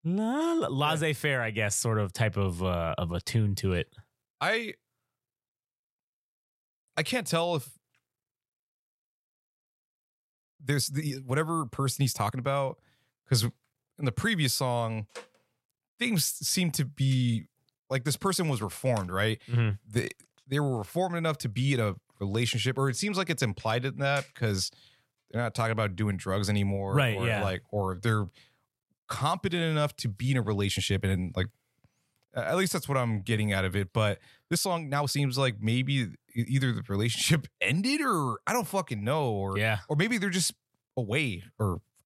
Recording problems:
uneven, jittery; strongly; from 11 to 41 s

